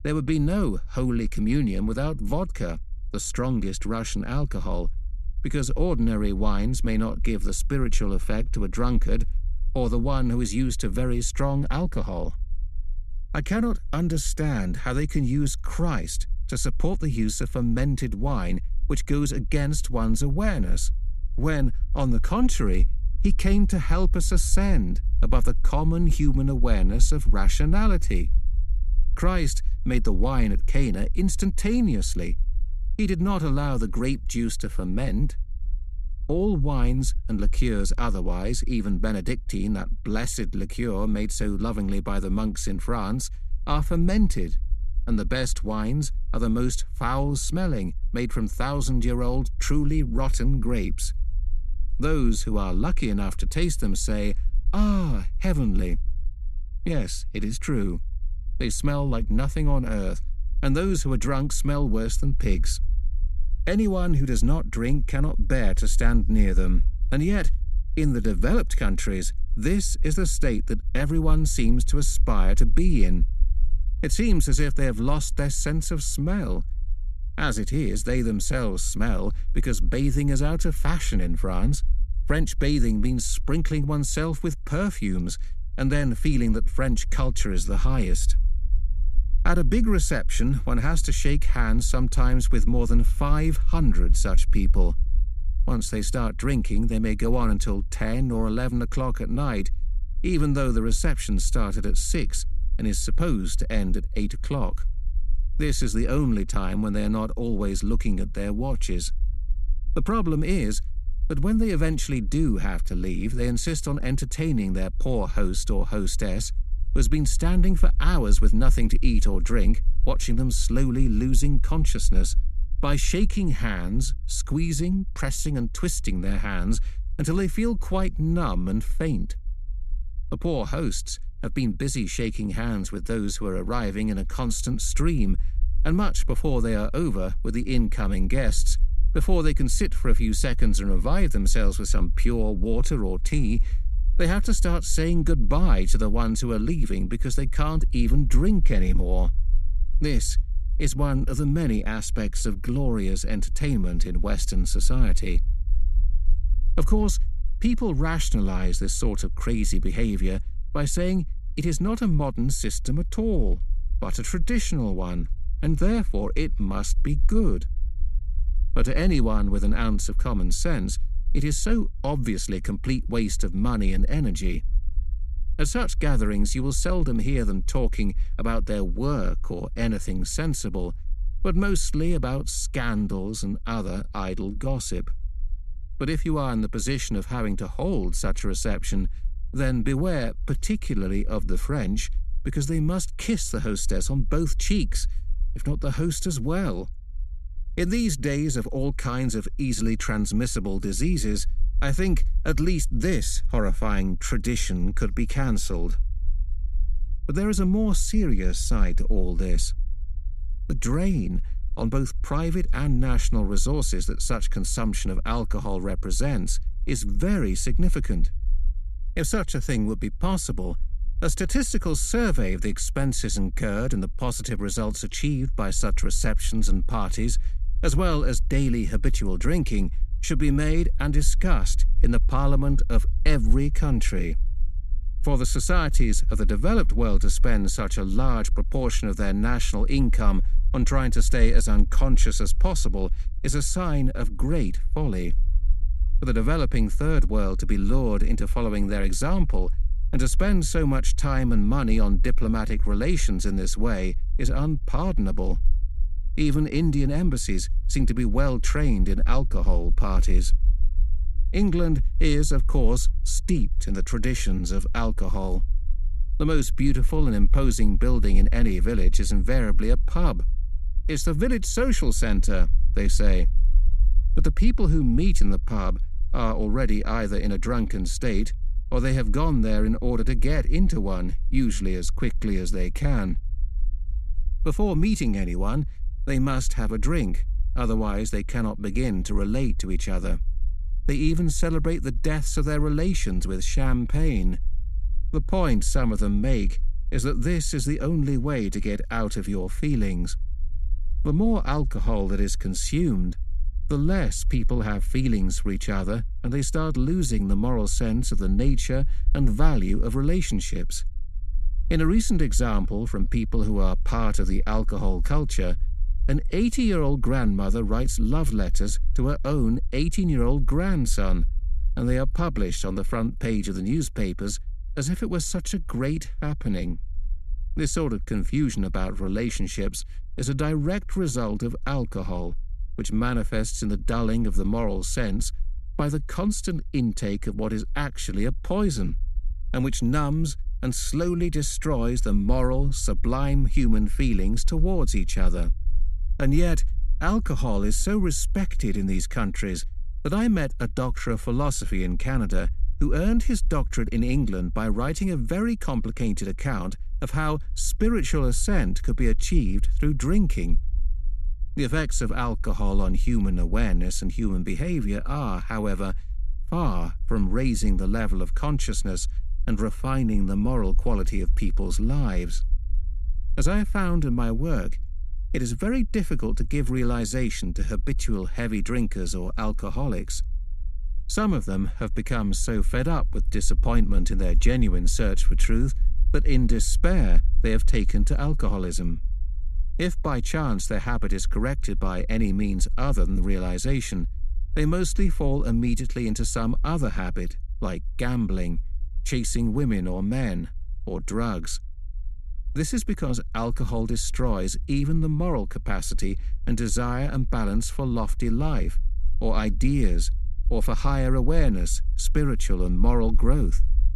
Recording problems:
low rumble; faint; throughout; 25 dB below the speech

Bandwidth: 14.5 kHz